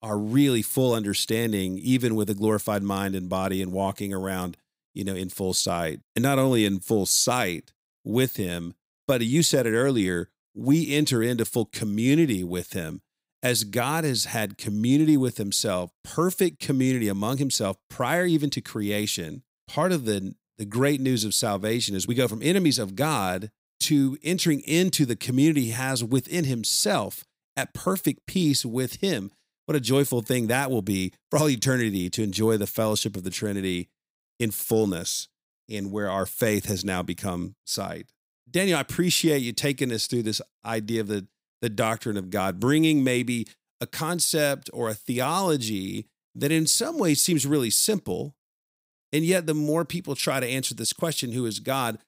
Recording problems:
none

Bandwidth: 15.5 kHz